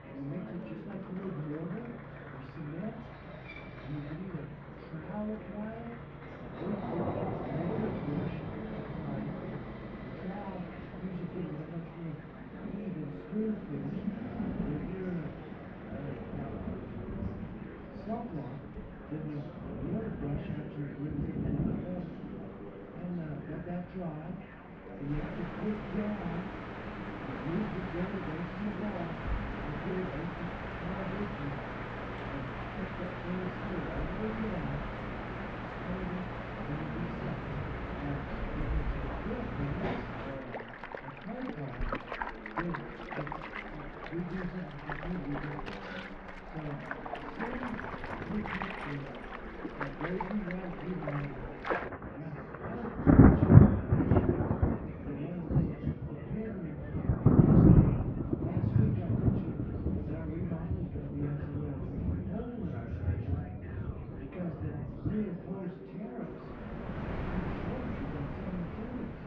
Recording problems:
off-mic speech; far
muffled; very; fading above 2 kHz
room echo; slight; dies away in 0.4 s
rain or running water; very loud; throughout; 7 dB above the speech
chatter from many people; loud; throughout; 6 dB below the speech
machinery noise; noticeable; throughout; 10 dB below the speech

